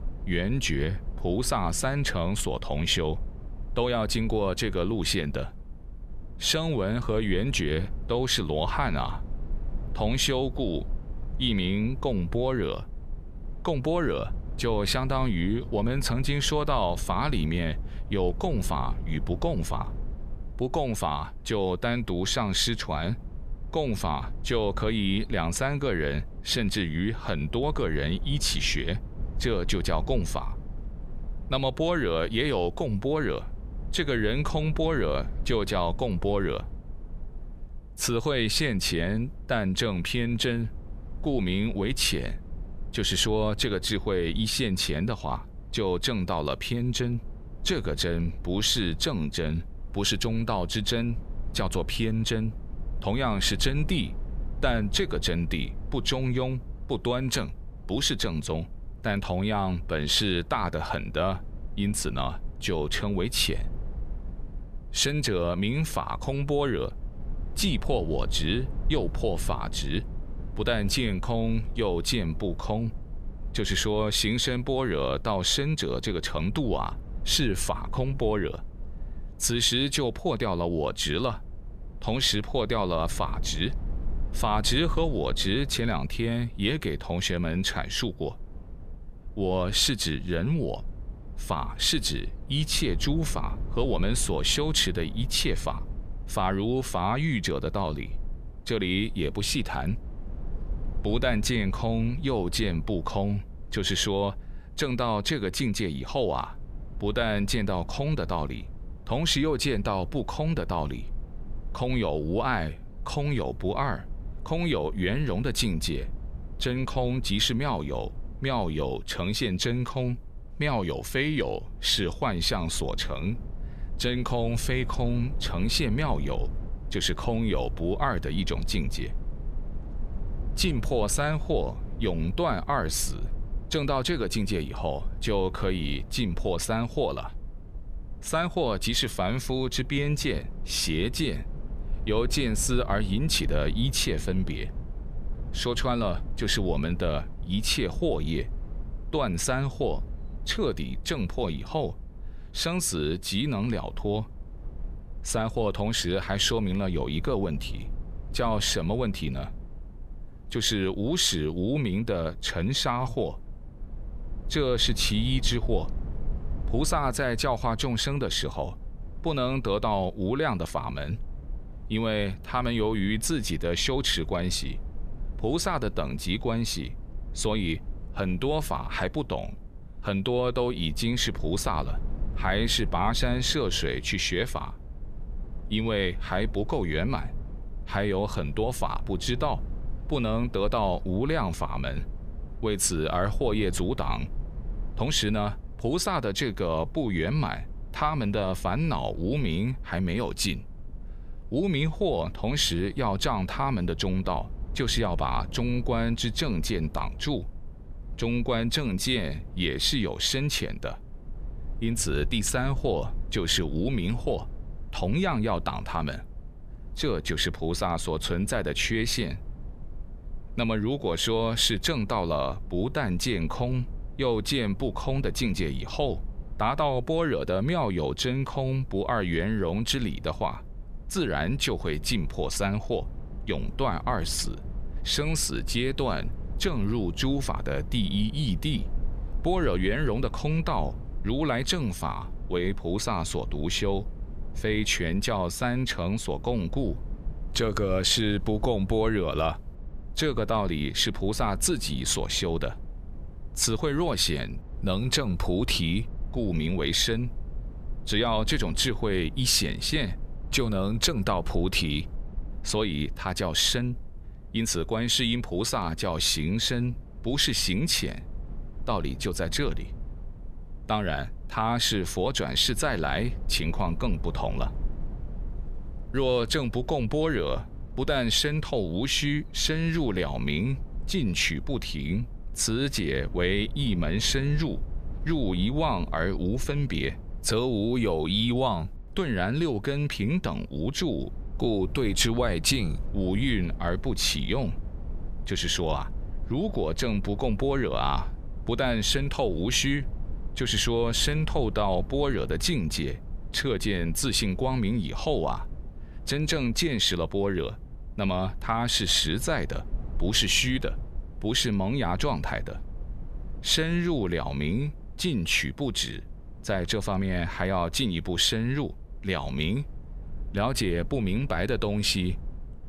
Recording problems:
low rumble; faint; throughout; 25 dB below the speech

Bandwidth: 14.5 kHz